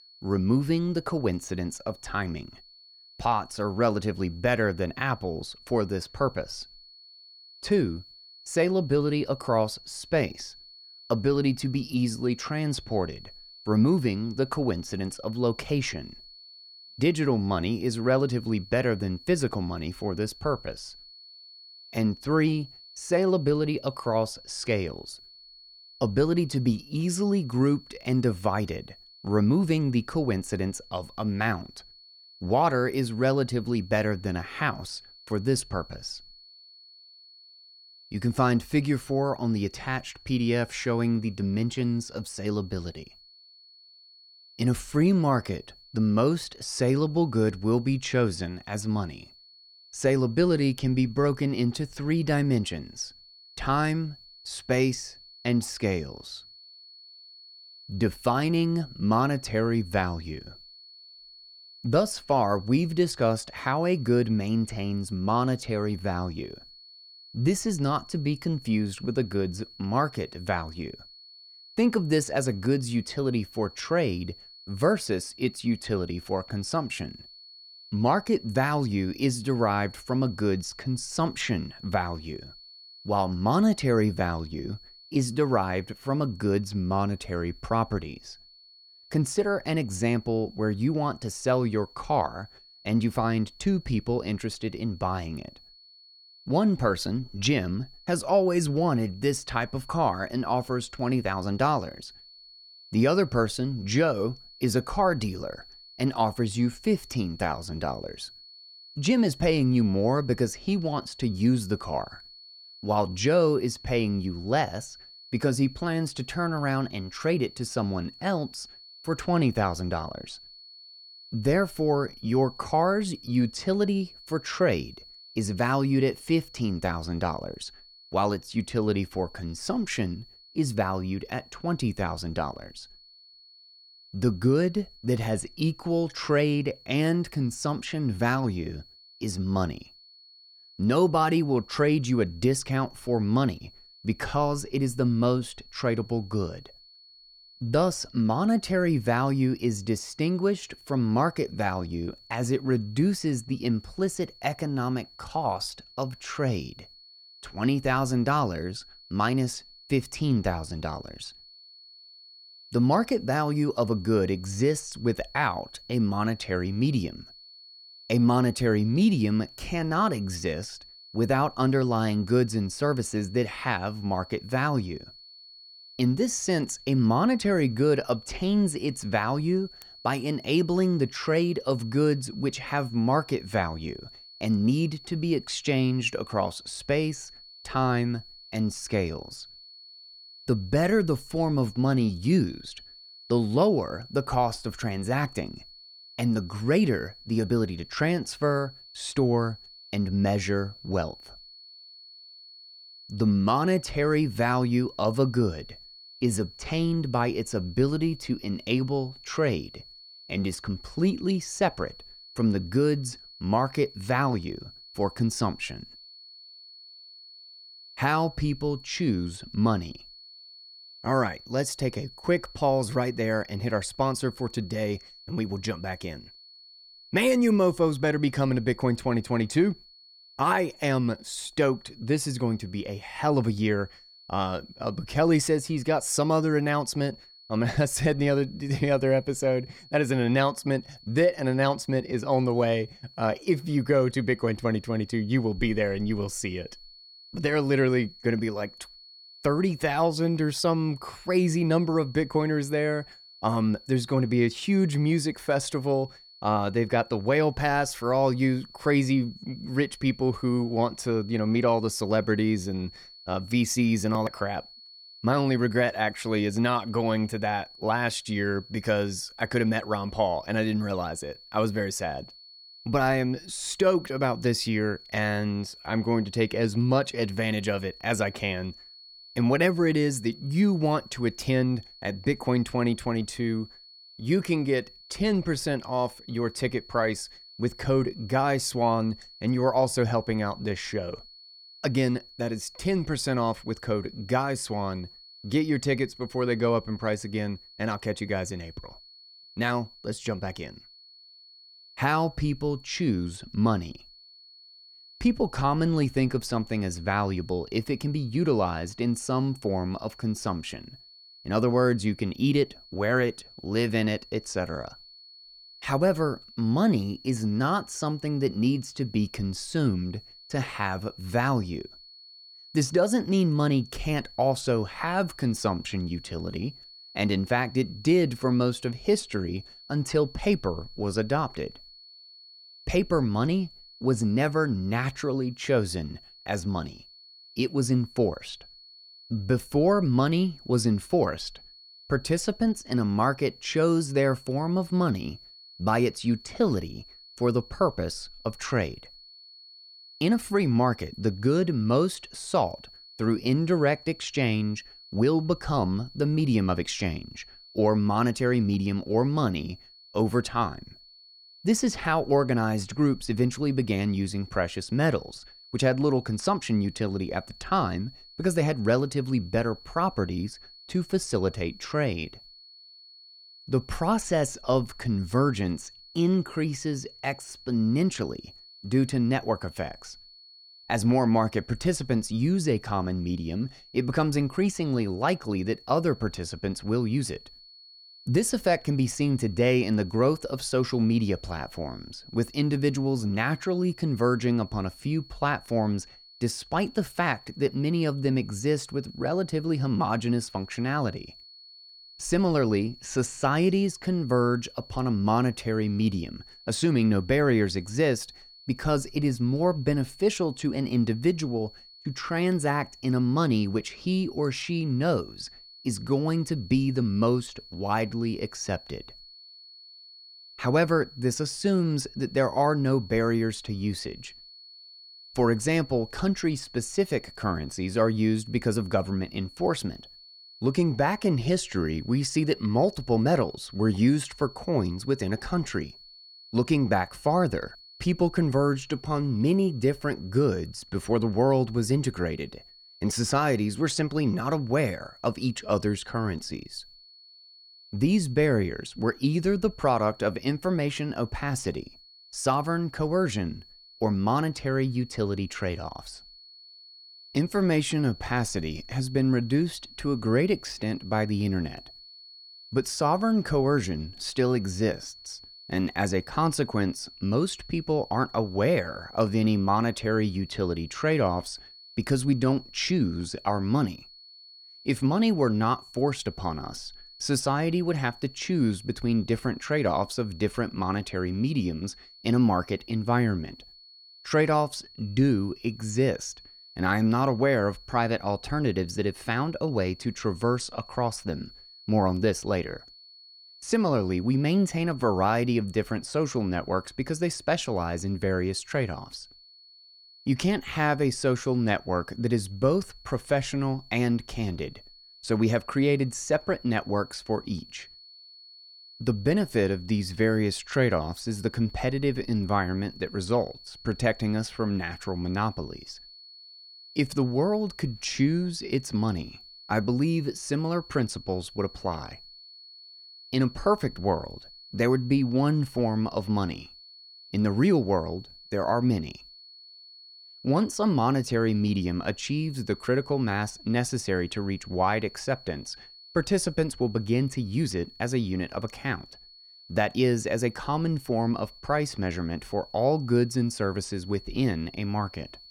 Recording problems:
high-pitched whine; faint; throughout; 4.5 kHz, 20 dB below the speech

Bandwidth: 18 kHz